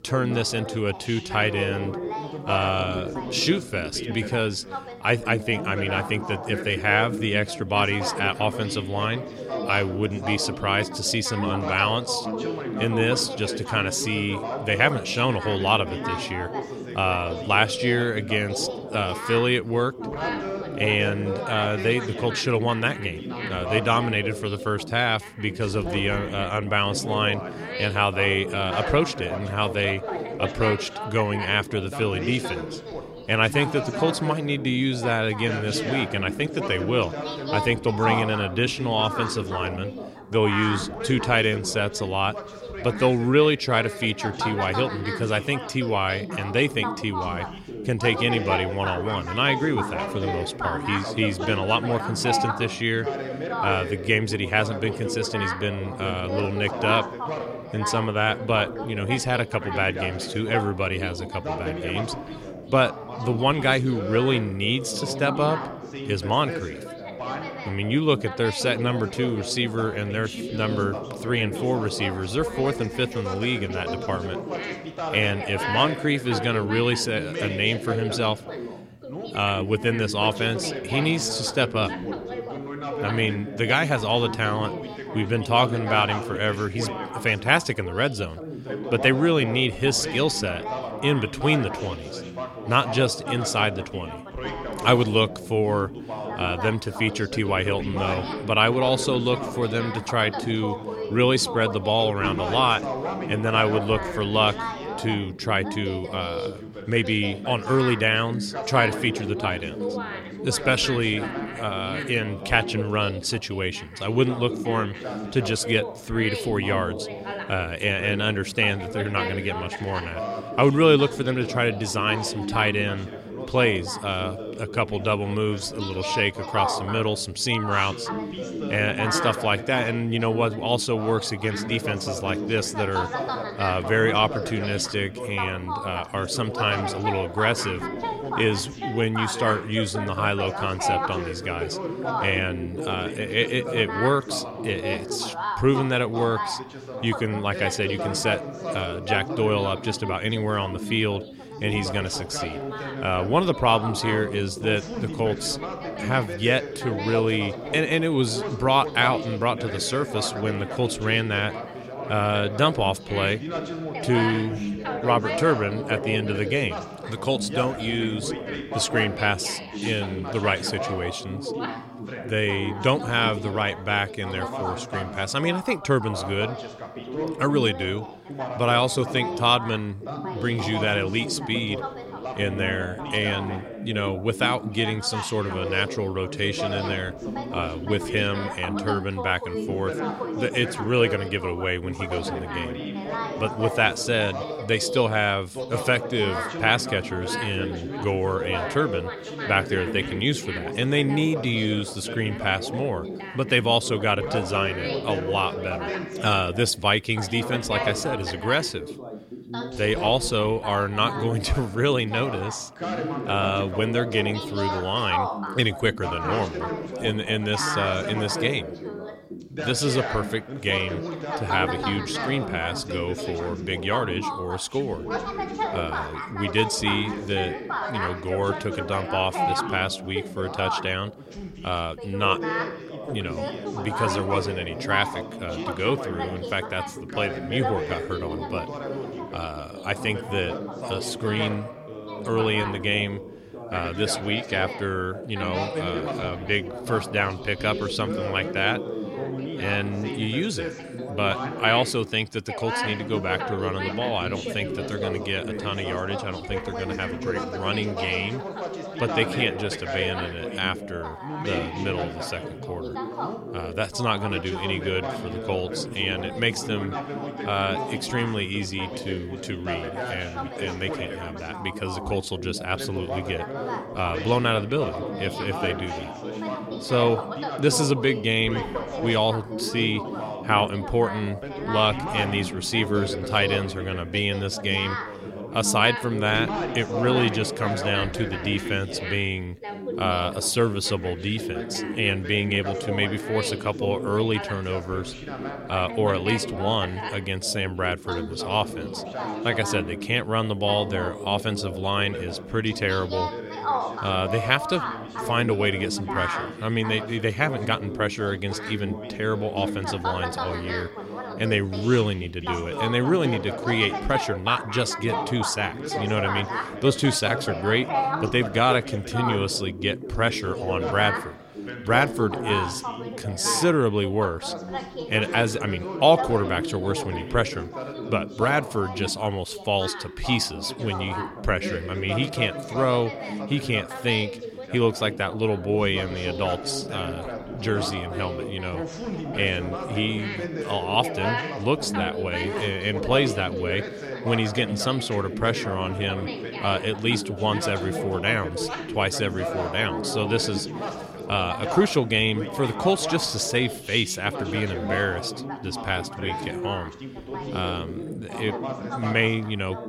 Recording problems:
background chatter; loud; throughout; 3 voices, 7 dB below the speech

